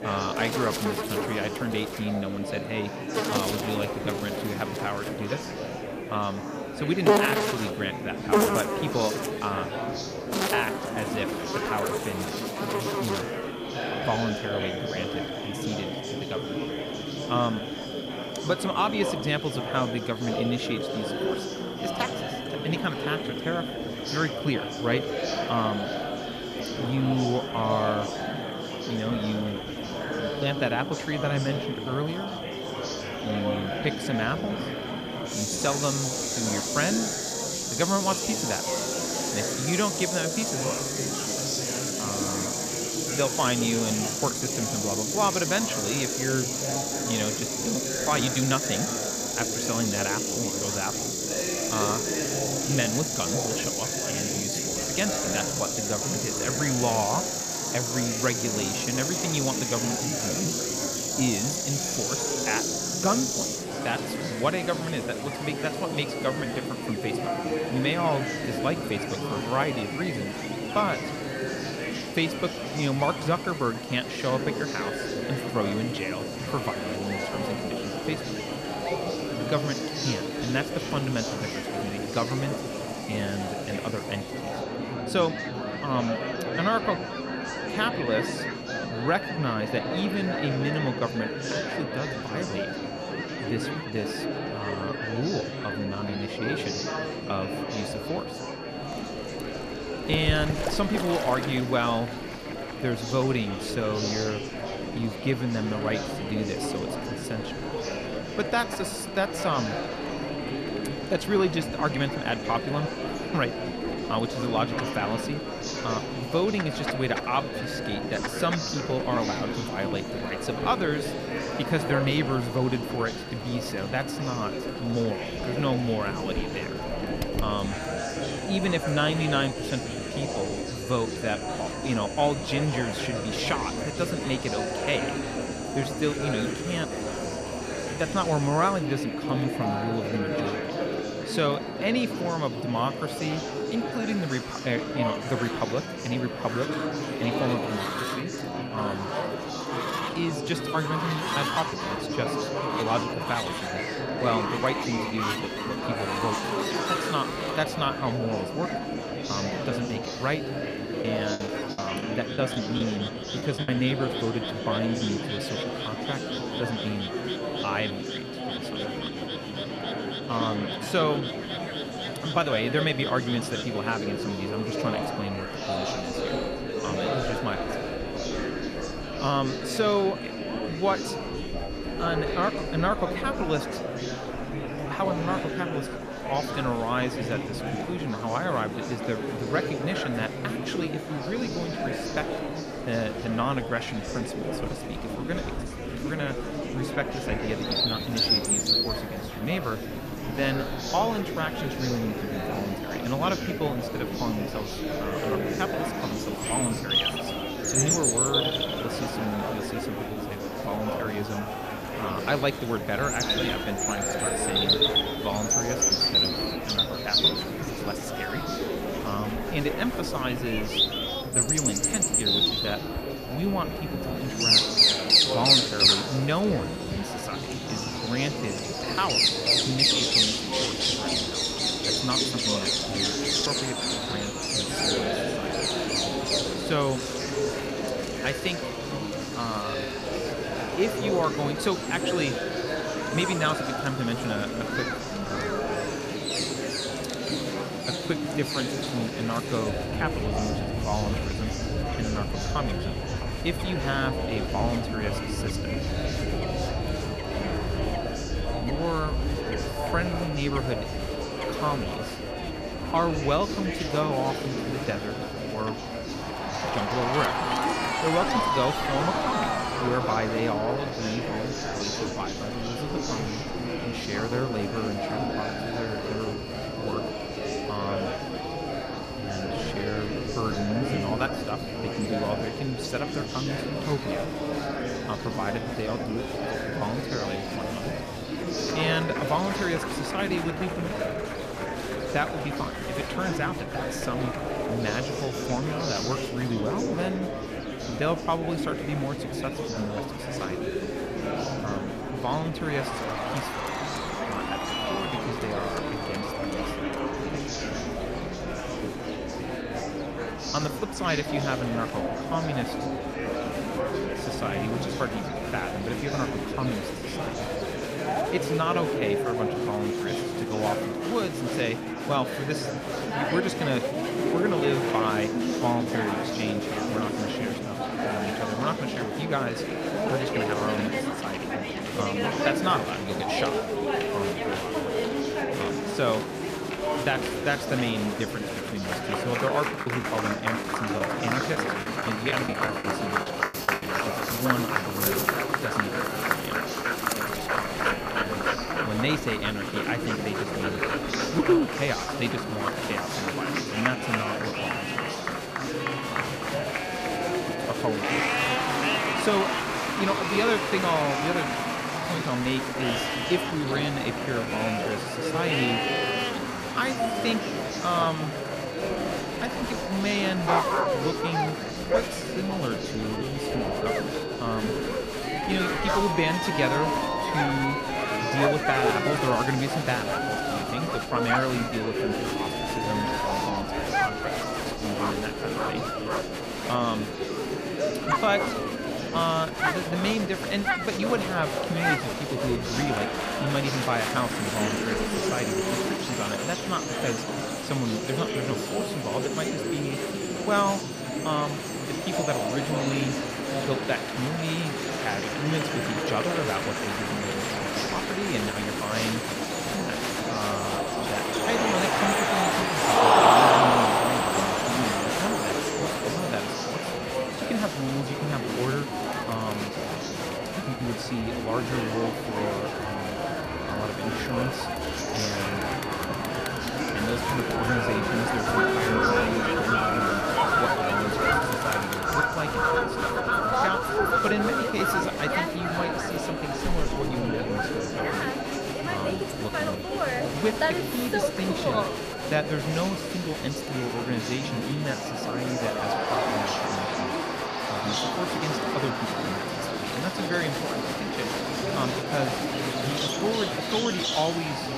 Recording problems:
murmuring crowd; very loud; throughout; as loud as the speech
animal sounds; loud; throughout; as loud as the speech
high-pitched whine; noticeable; from 1:05 to 3:03, from 3:41 to 4:44 and from 5:42 on; 4.5 kHz, 15 dB below the speech
choppy; very; from 2:41 to 2:44 and from 5:40 to 5:44; 13% of the speech affected

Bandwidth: 14.5 kHz